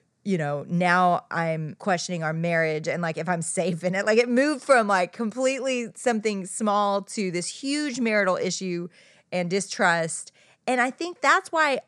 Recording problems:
none

